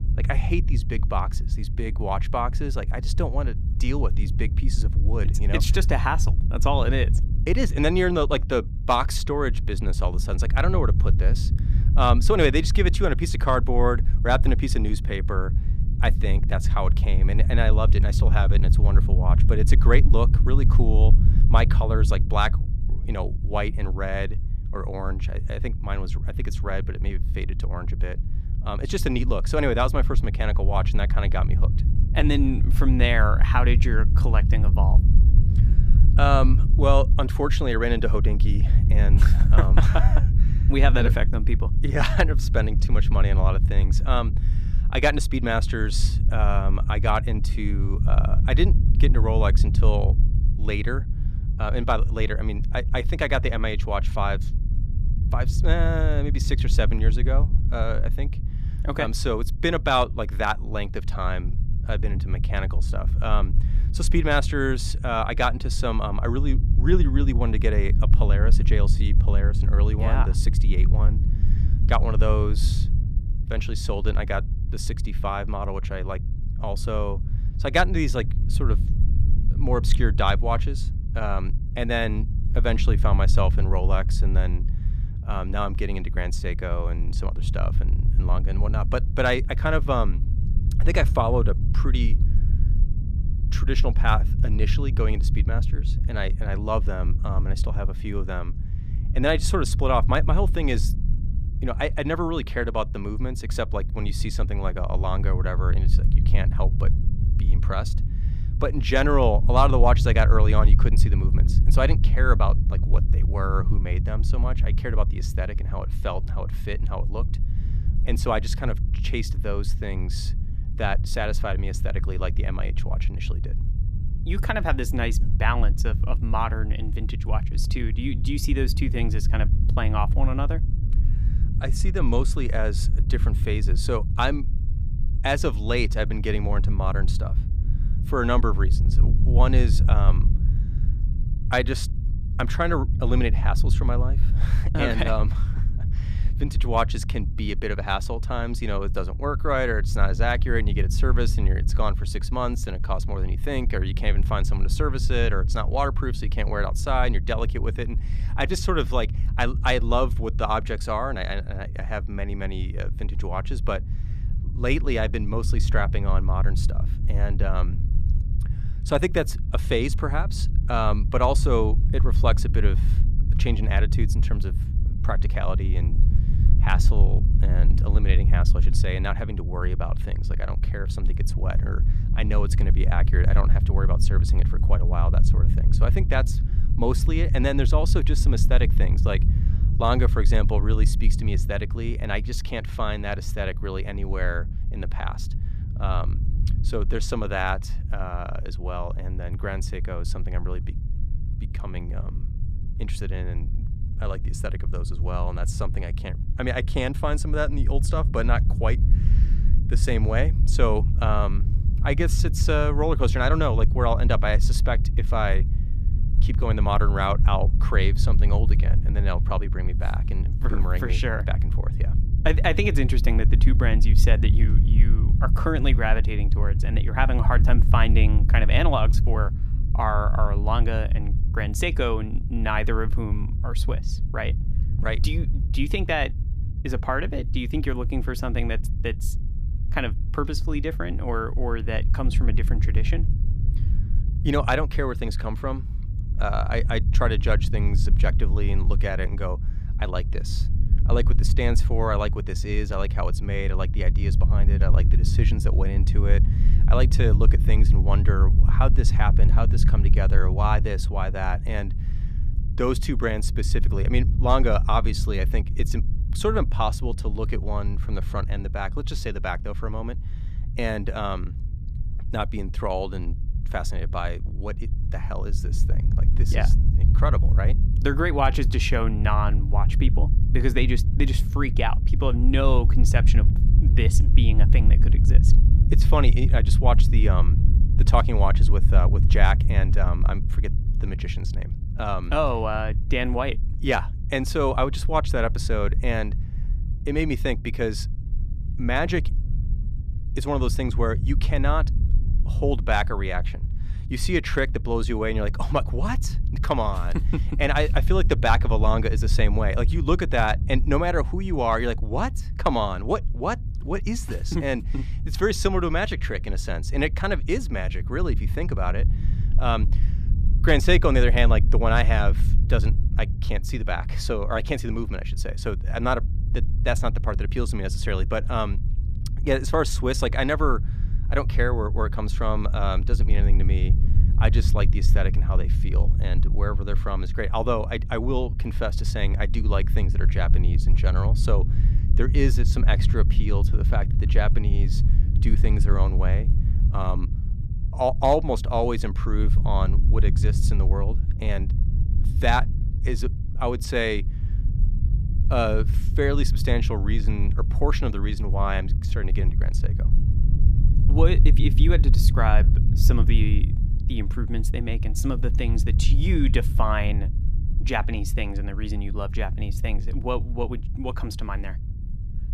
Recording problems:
low rumble; noticeable; throughout; 15 dB below the speech

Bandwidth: 14.5 kHz